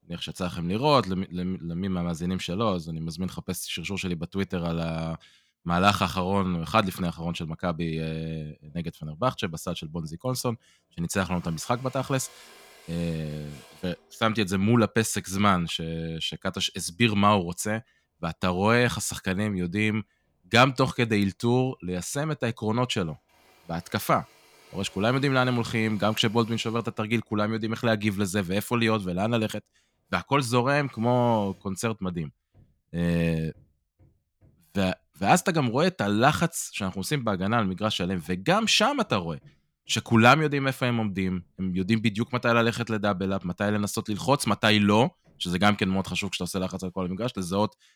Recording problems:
machinery noise; faint; throughout; 30 dB below the speech

